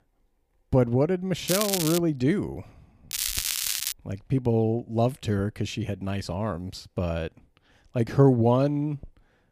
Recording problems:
crackling; loud; at 1.5 s and at 3 s; 2 dB below the speech

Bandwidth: 15 kHz